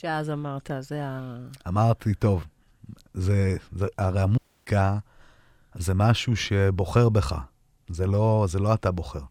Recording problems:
audio cutting out; at 4.5 s

